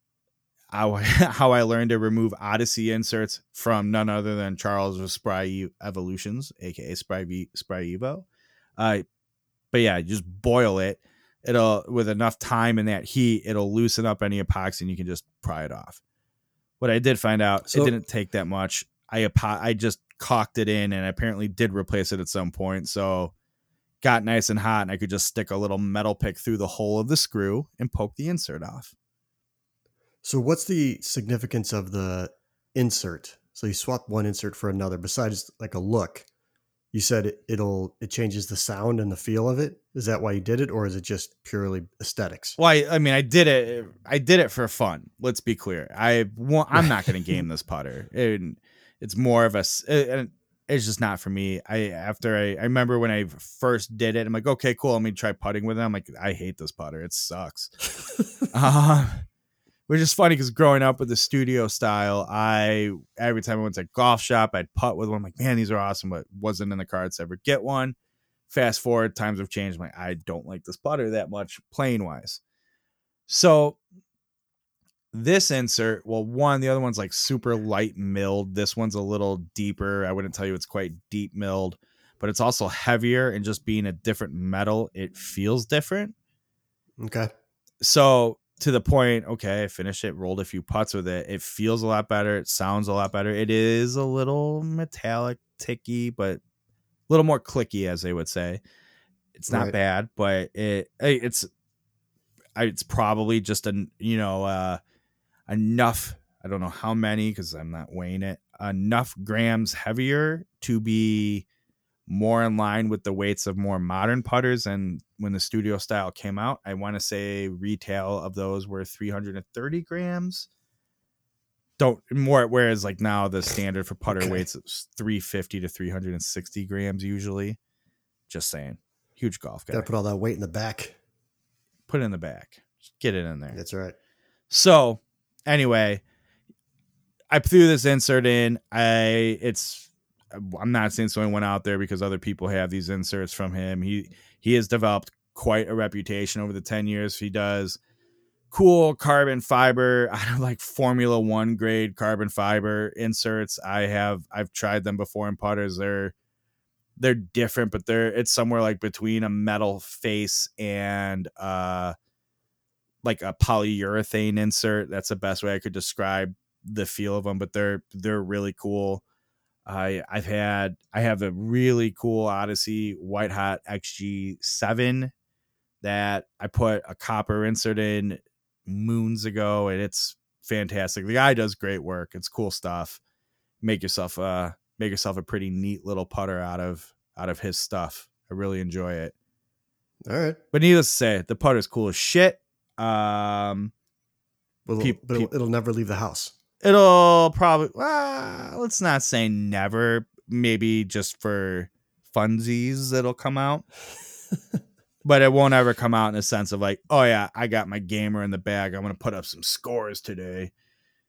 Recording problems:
none

